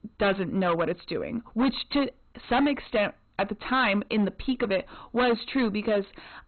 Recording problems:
distortion; heavy; 11% of the sound clipped
garbled, watery; badly; nothing above 4 kHz

